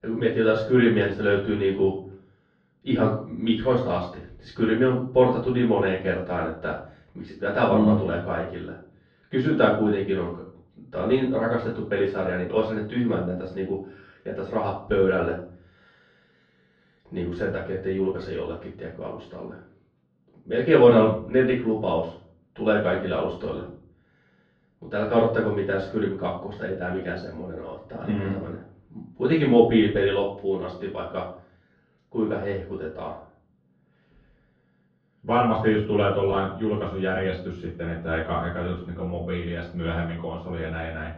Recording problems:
off-mic speech; far
room echo; noticeable; dies away in 0.5 s
muffled; slightly; fading above 3.5 kHz

